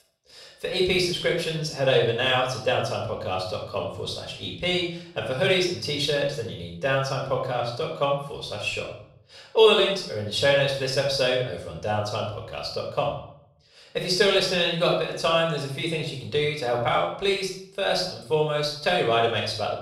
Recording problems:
off-mic speech; far
room echo; noticeable; dies away in 0.5 s

